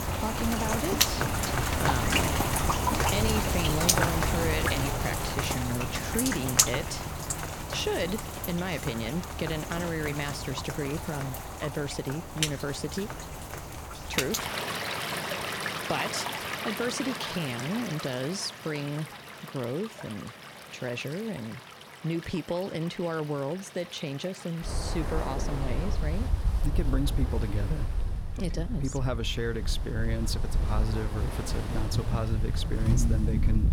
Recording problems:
rain or running water; very loud; throughout; 3 dB above the speech

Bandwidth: 18 kHz